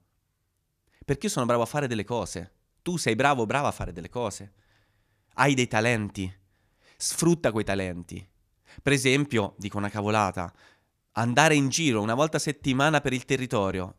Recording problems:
none

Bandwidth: 14.5 kHz